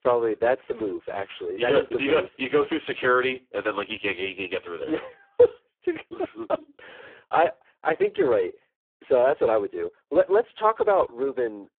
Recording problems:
phone-call audio; poor line

